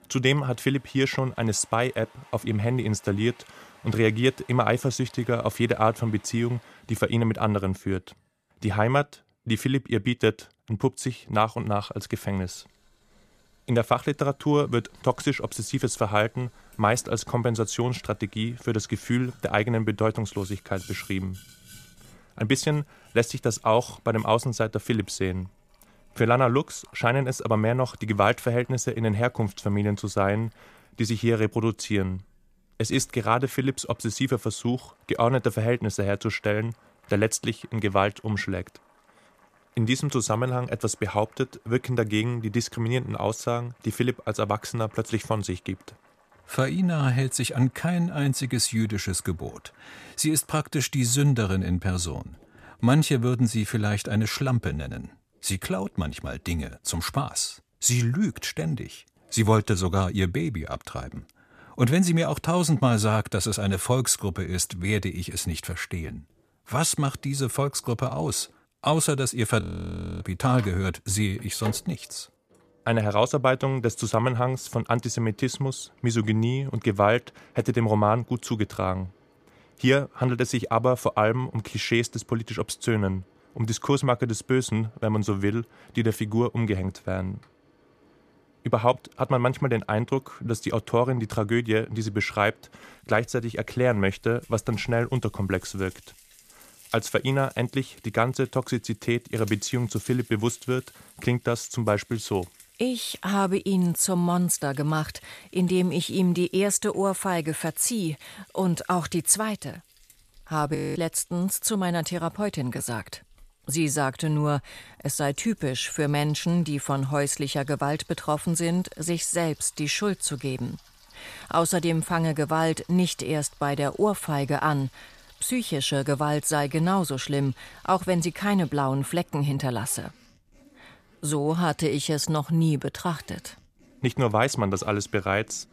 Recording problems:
household noises; faint; throughout; 30 dB below the speech
audio freezing; at 1:10 for 0.5 s and at 1:51

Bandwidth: 14.5 kHz